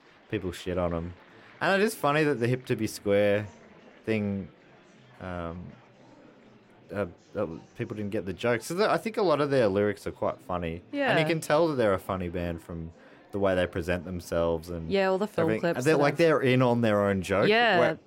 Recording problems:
murmuring crowd; faint; throughout; 25 dB below the speech

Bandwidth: 16 kHz